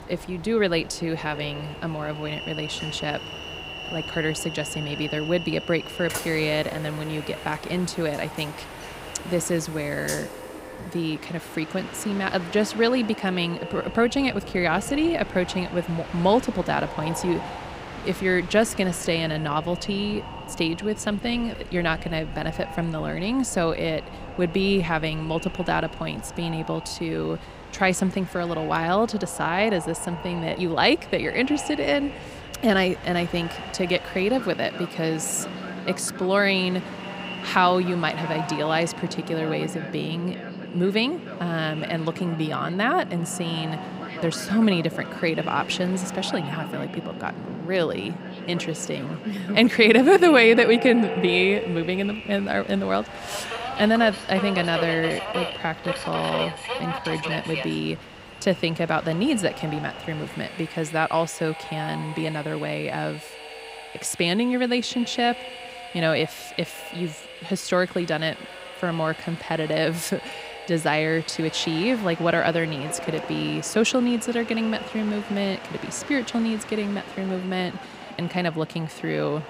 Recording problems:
echo of what is said; noticeable; throughout; 200 ms later, 15 dB below the speech
train or aircraft noise; noticeable; throughout; 10 dB below the speech

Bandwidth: 15.5 kHz